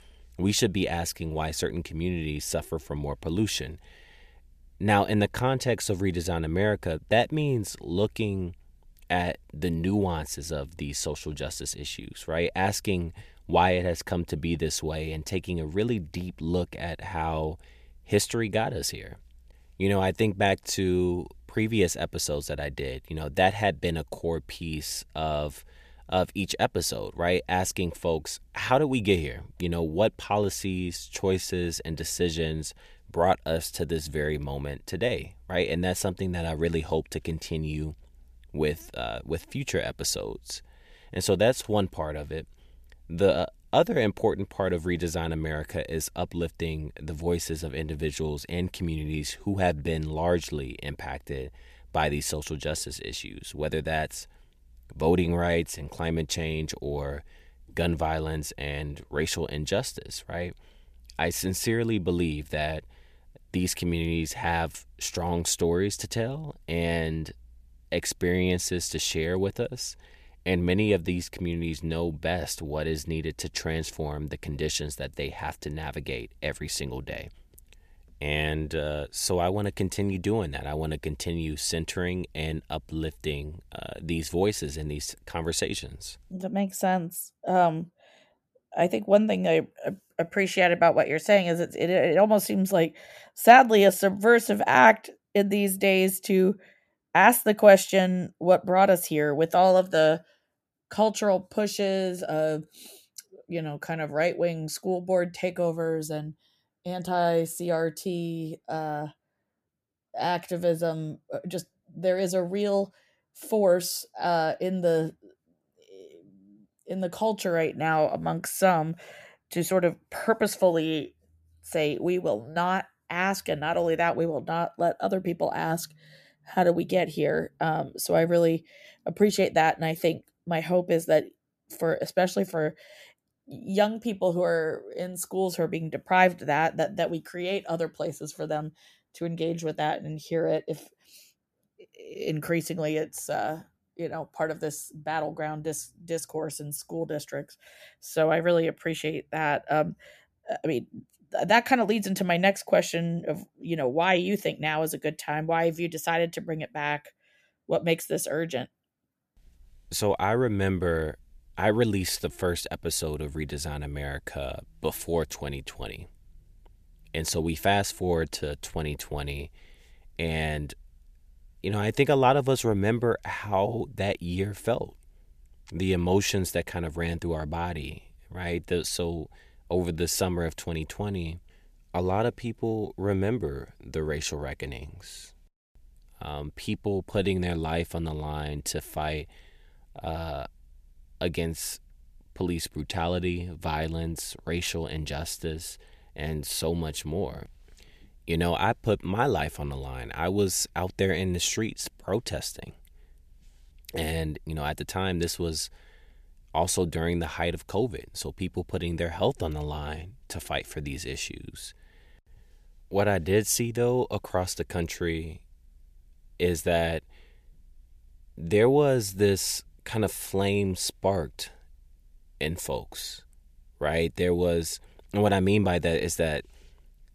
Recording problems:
none

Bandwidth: 14.5 kHz